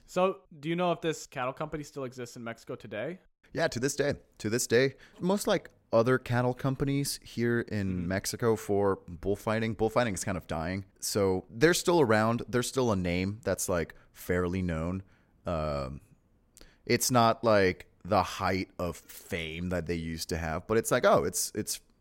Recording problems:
none

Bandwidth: 16 kHz